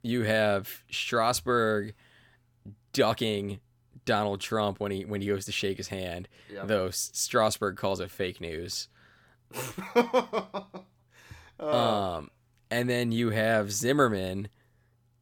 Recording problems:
none

